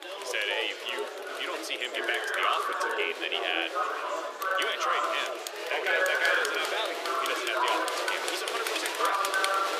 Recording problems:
thin; very; fading below 350 Hz
chatter from many people; very loud; throughout; 2 dB above the speech

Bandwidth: 14.5 kHz